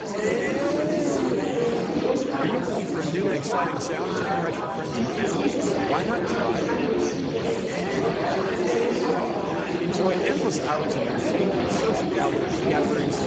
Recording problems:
garbled, watery; badly; nothing above 7.5 kHz
murmuring crowd; very loud; throughout; 3 dB above the speech

